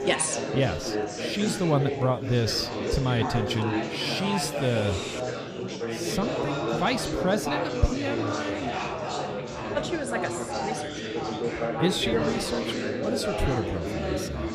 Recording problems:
chatter from many people; loud; throughout; 1 dB below the speech

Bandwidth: 15 kHz